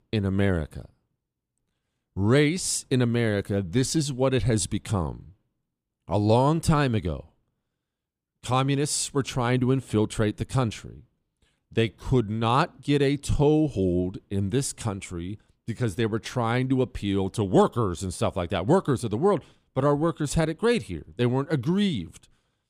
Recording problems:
none

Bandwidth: 15 kHz